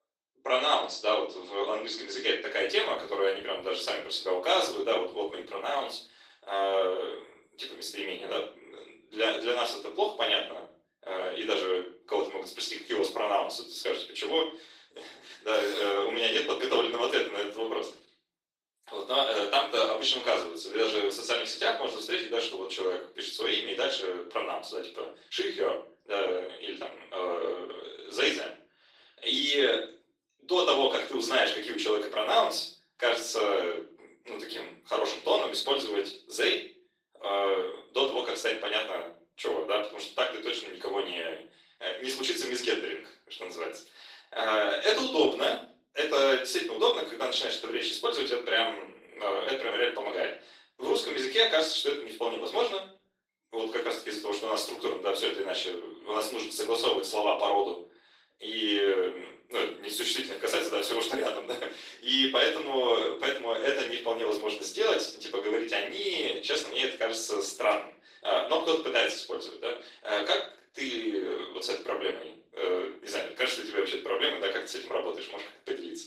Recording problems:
off-mic speech; far
thin; somewhat; fading below 350 Hz
room echo; slight; dies away in 0.4 s
garbled, watery; slightly; nothing above 15.5 kHz

